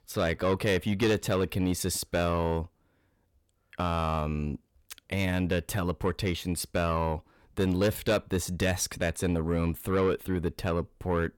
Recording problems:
distortion; slight; 10 dB below the speech

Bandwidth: 17.5 kHz